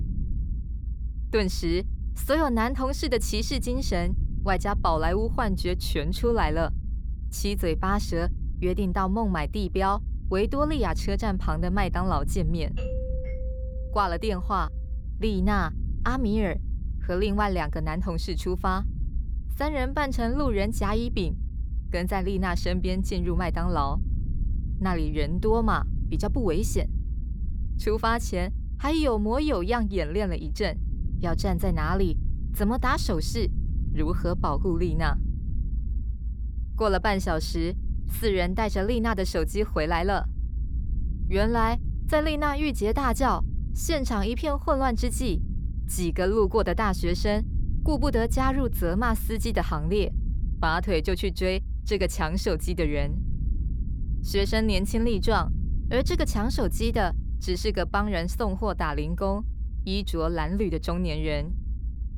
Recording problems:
low rumble; faint; throughout; 20 dB below the speech
doorbell; noticeable; from 13 to 15 s; peak 10 dB below the speech

